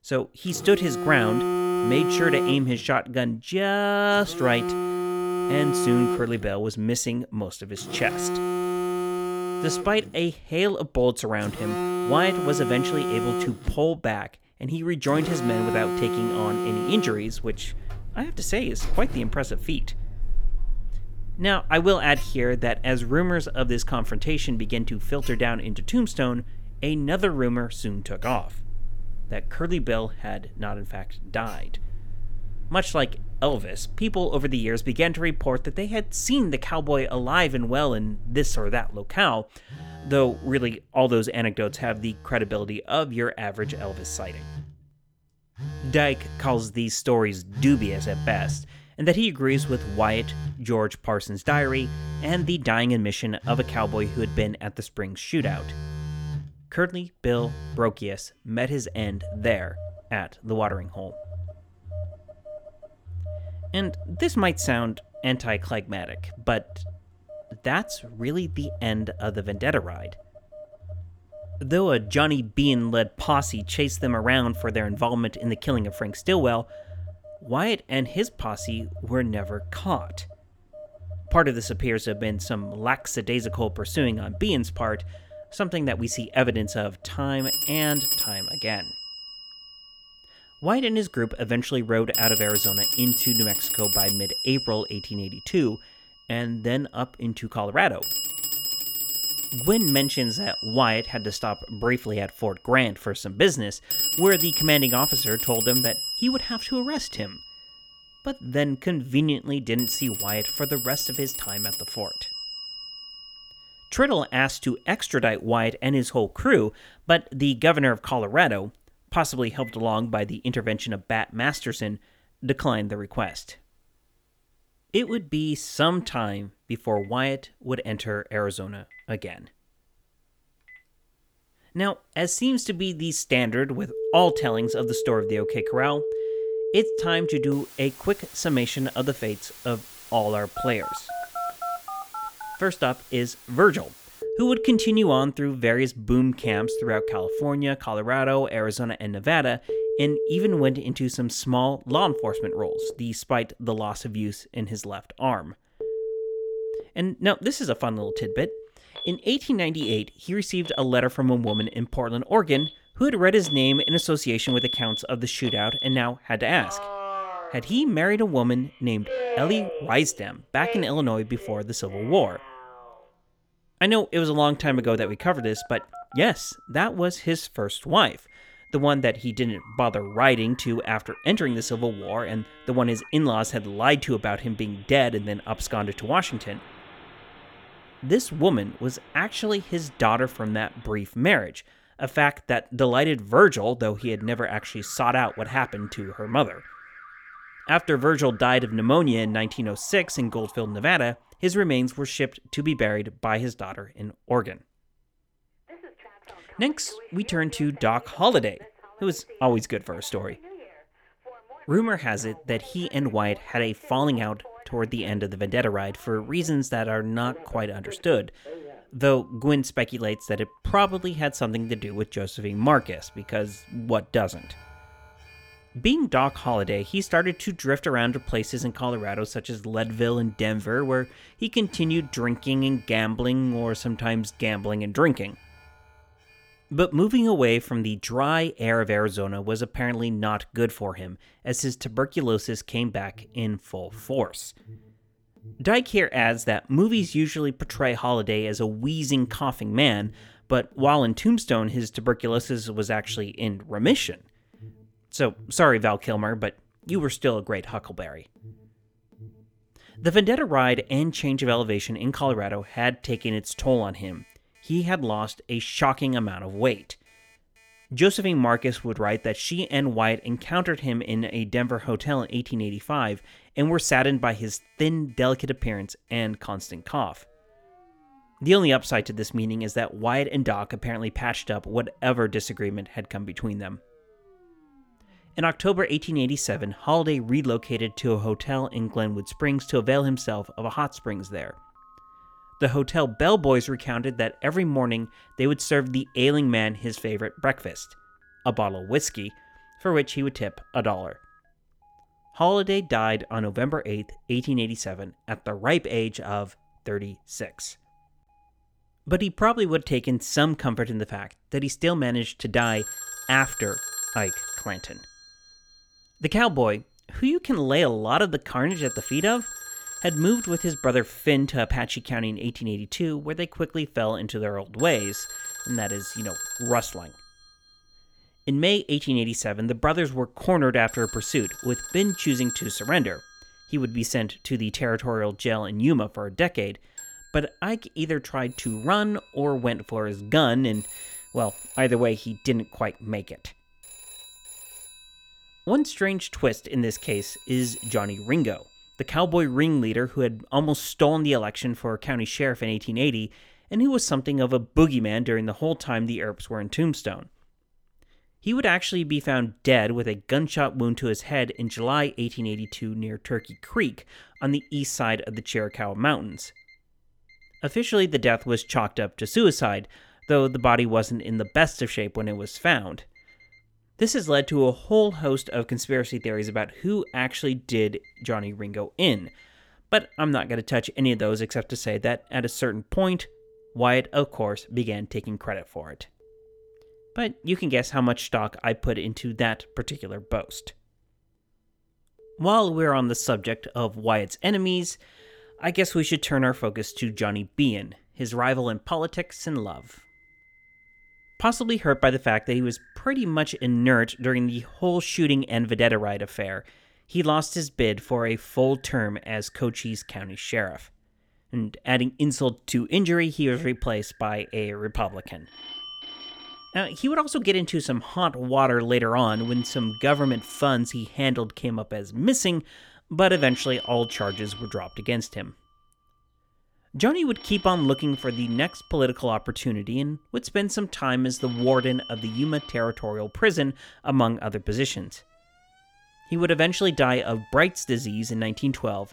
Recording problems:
alarms or sirens; loud; throughout; 6 dB below the speech

